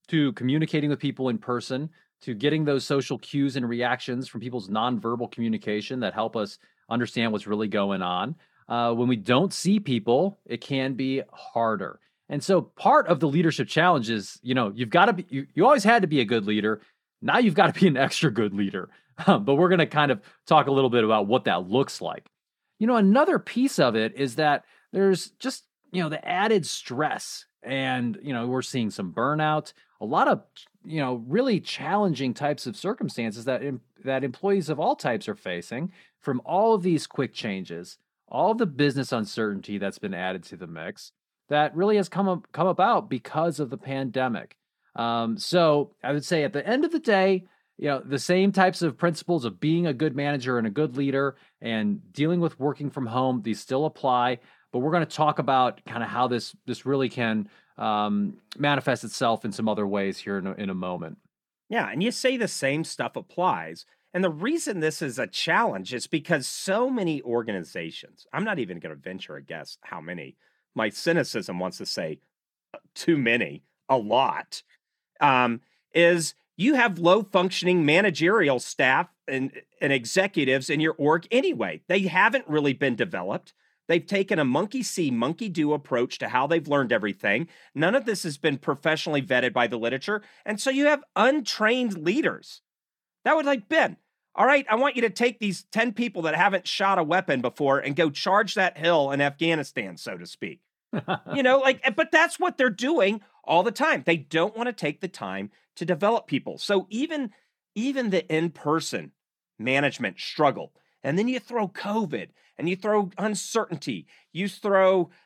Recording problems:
none

